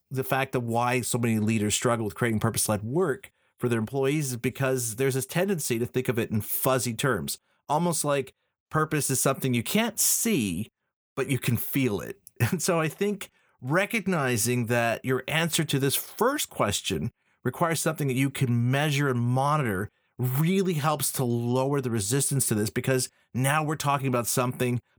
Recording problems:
none

